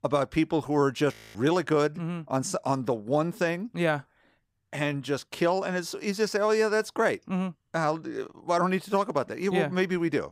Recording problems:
audio freezing; at 1 s

